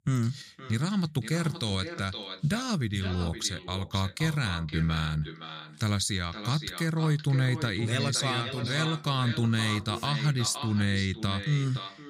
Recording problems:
echo of what is said; strong; throughout; 520 ms later, 10 dB below the speech

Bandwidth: 15.5 kHz